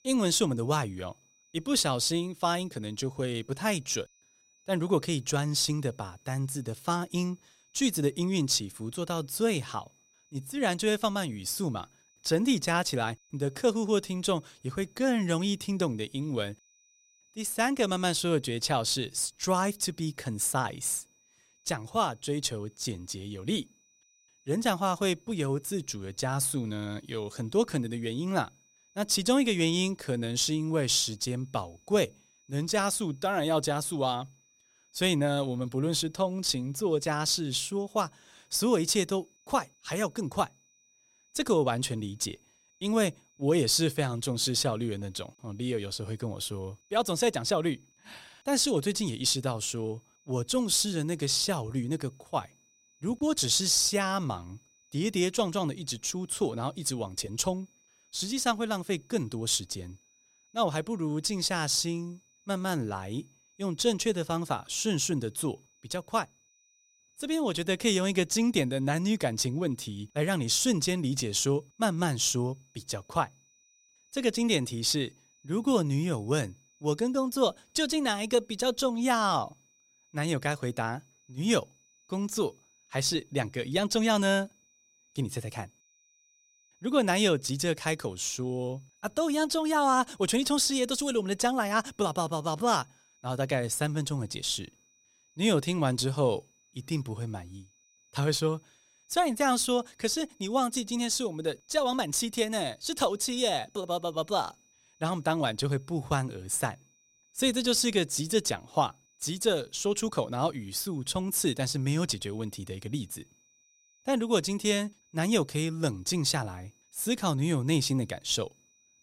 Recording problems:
high-pitched whine; faint; throughout; 6 kHz, 35 dB below the speech

